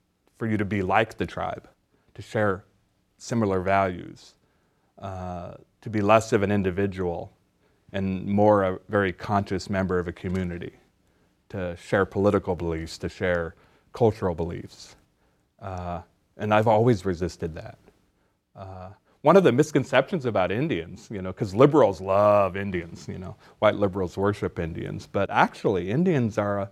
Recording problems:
none

